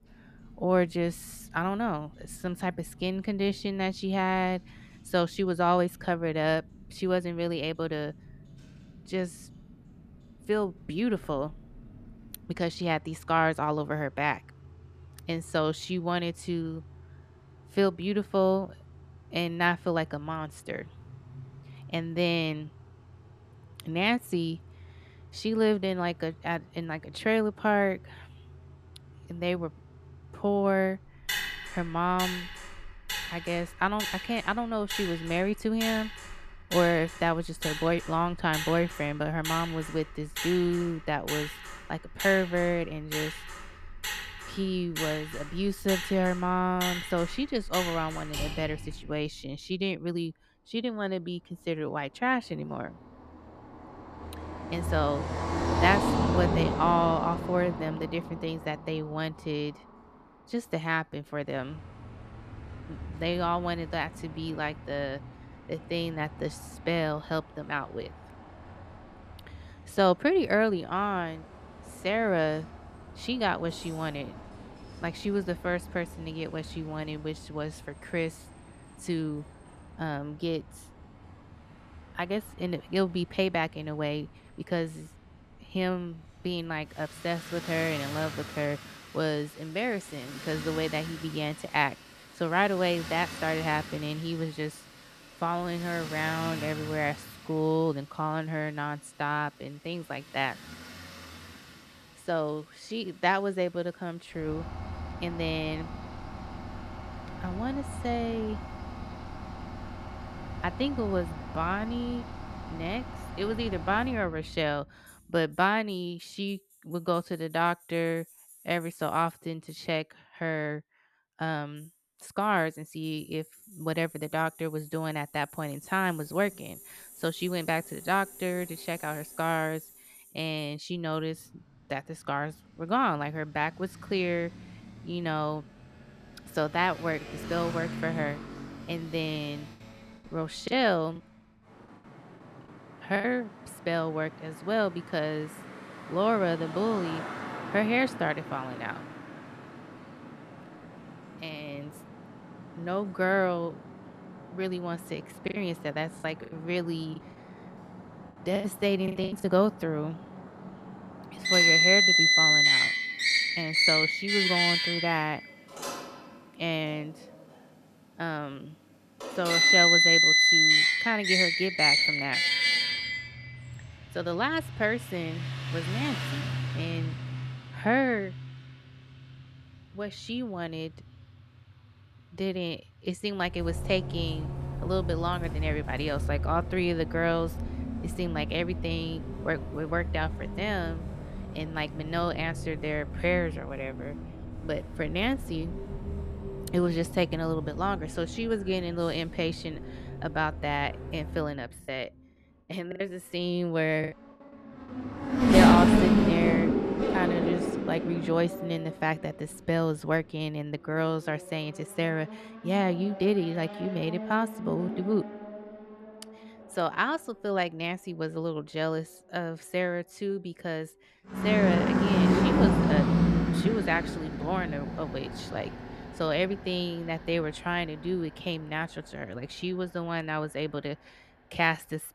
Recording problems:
traffic noise; very loud; throughout; 2 dB above the speech
choppy; very; from 2:21 to 2:23, from 2:35 to 2:39 and from 3:22 to 3:24; 12% of the speech affected

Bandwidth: 14.5 kHz